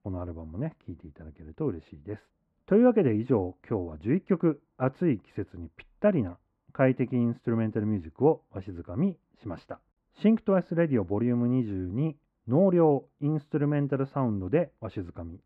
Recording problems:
muffled; very; fading above 1.5 kHz

